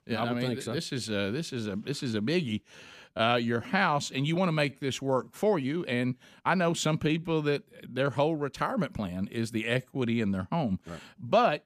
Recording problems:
uneven, jittery; strongly; from 0.5 to 11 s

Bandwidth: 15 kHz